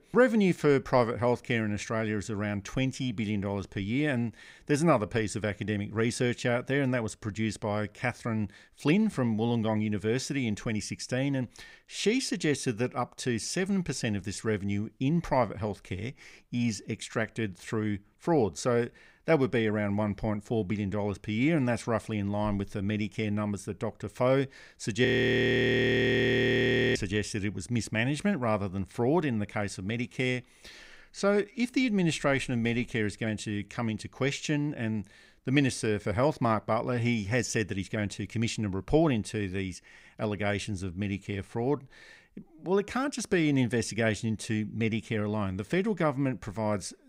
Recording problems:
audio freezing; at 25 s for 2 s

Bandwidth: 15.5 kHz